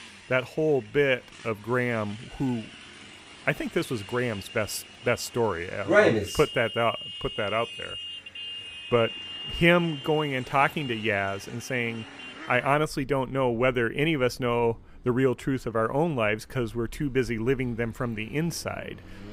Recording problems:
traffic noise; noticeable; throughout; 15 dB below the speech

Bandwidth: 15.5 kHz